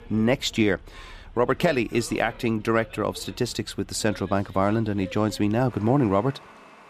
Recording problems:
traffic noise; faint; throughout; 20 dB below the speech

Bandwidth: 14.5 kHz